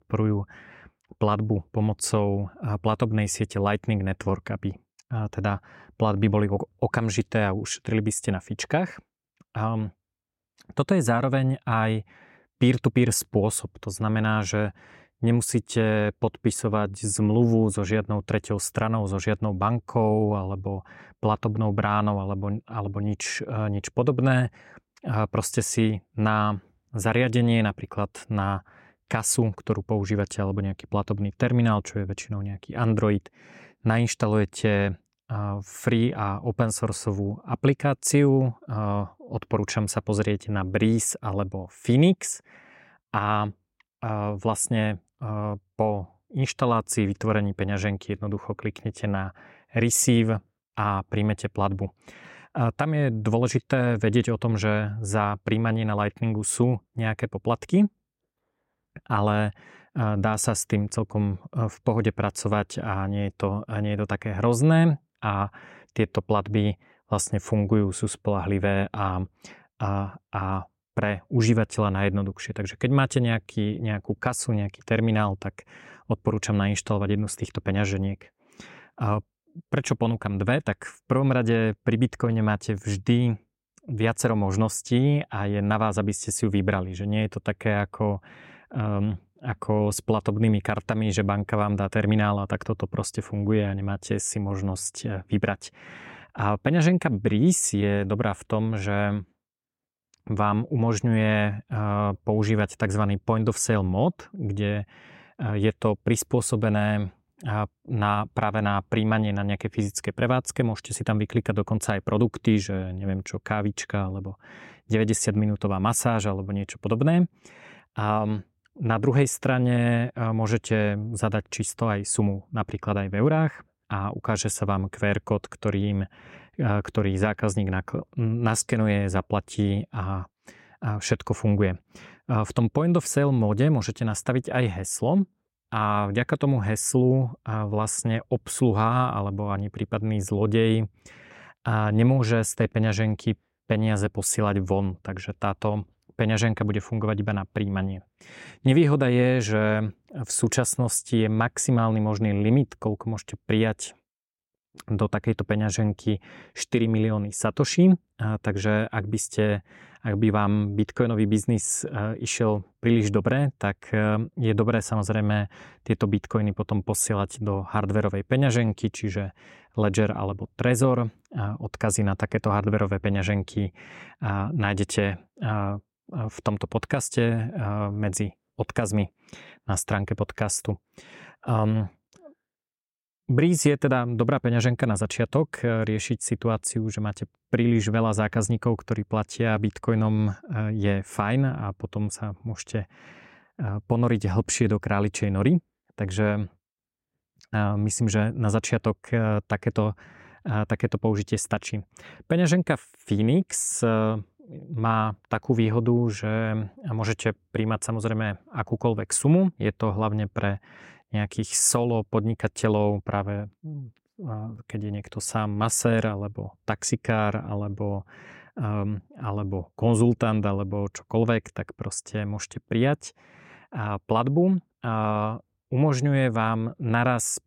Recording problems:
none

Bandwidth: 16 kHz